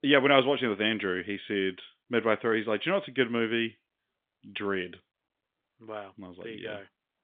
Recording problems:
phone-call audio; nothing above 3.5 kHz

